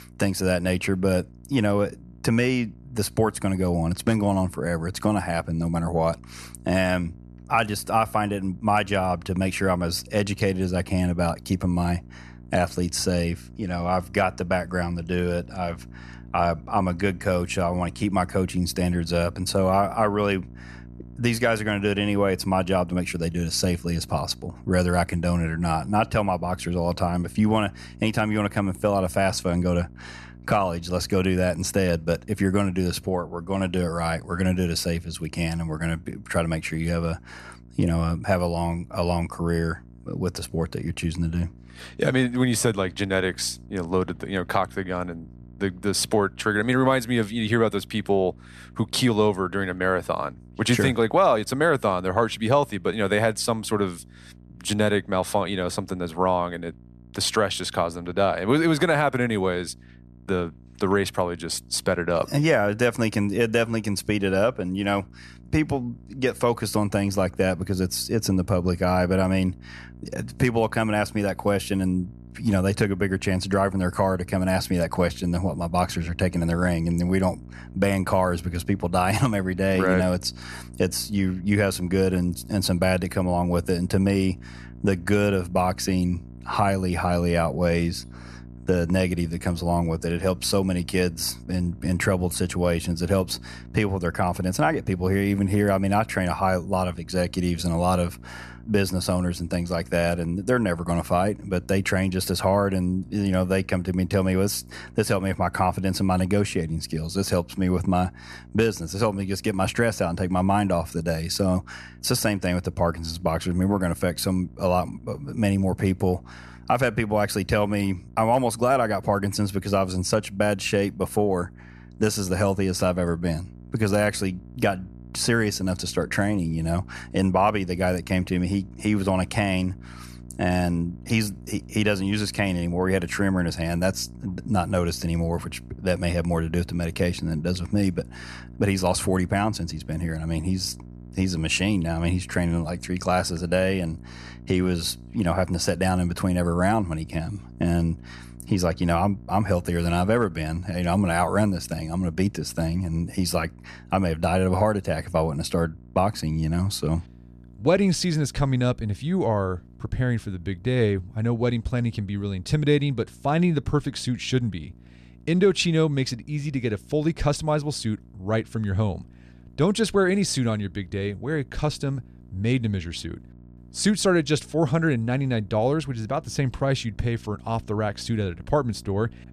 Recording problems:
electrical hum; faint; throughout; 60 Hz, 30 dB below the speech

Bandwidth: 13.5 kHz